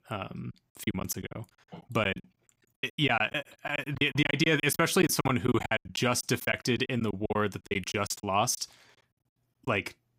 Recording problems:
choppy; very; 18% of the speech affected

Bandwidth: 15.5 kHz